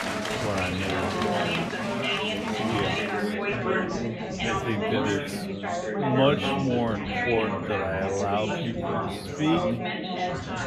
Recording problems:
wrong speed, natural pitch; too slow; 0.6 times normal speed
chatter from many people; very loud; throughout; 1 dB above the speech

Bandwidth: 15 kHz